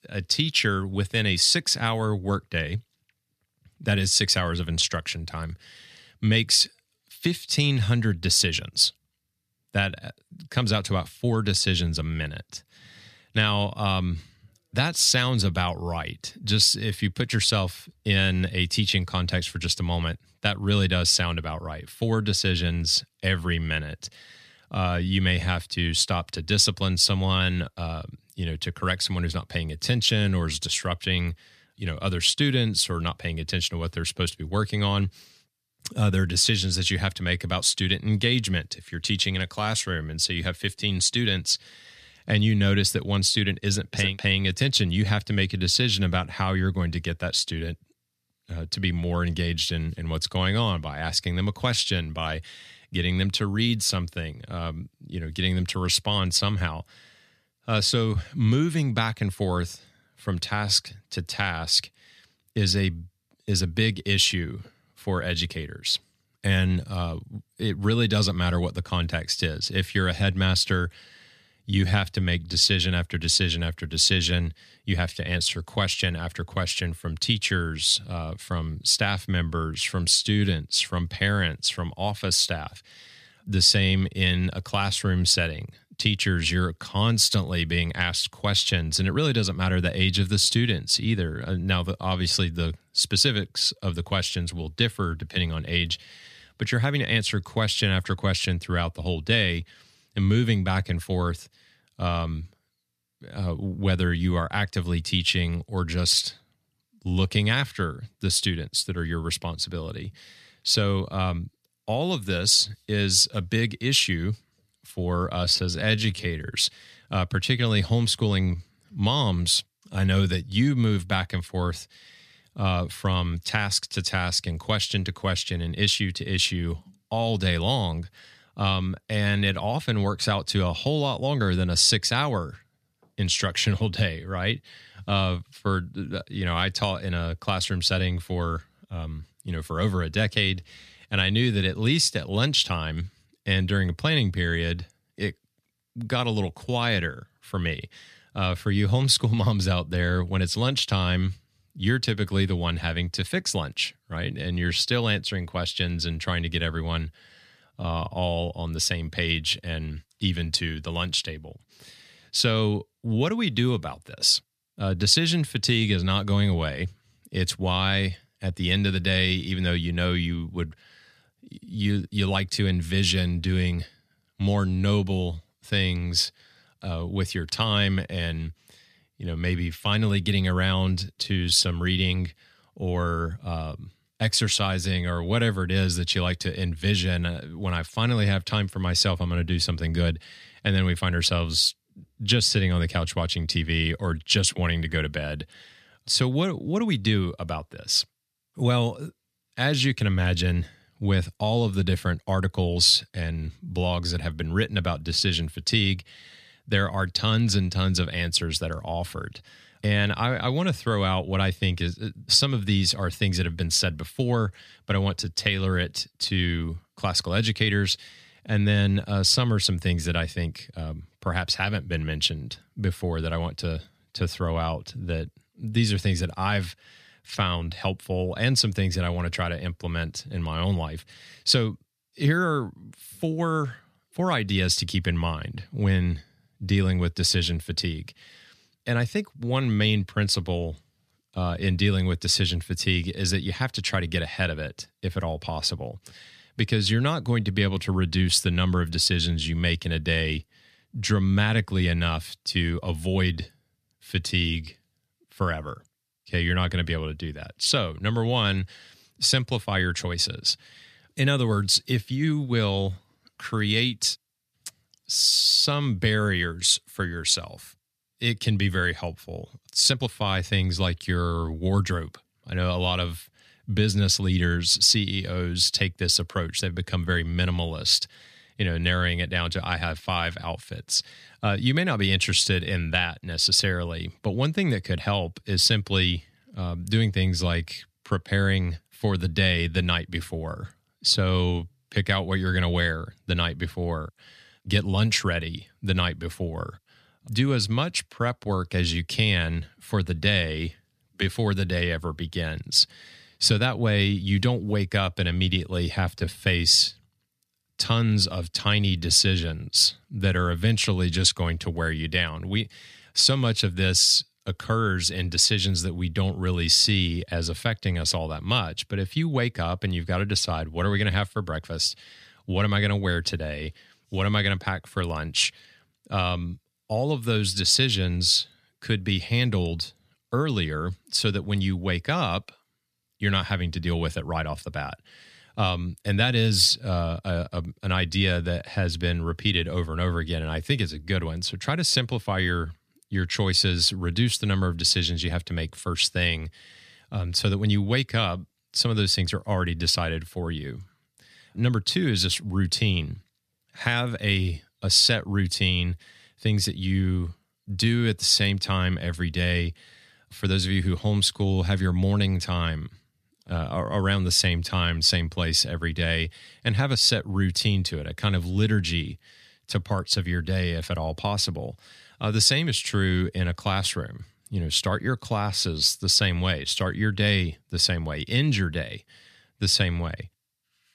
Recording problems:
uneven, jittery; strongly; from 1:12 to 5:06

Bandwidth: 14.5 kHz